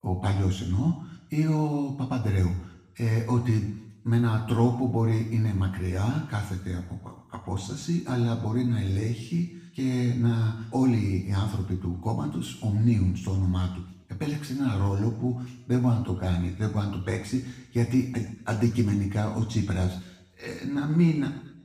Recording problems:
off-mic speech; far
room echo; noticeable; dies away in 0.8 s

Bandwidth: 15.5 kHz